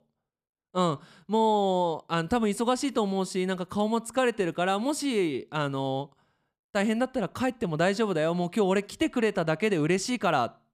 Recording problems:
none

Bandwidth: 15 kHz